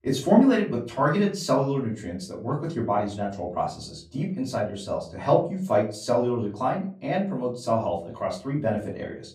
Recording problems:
off-mic speech; far
room echo; slight; dies away in 0.4 s

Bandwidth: 15.5 kHz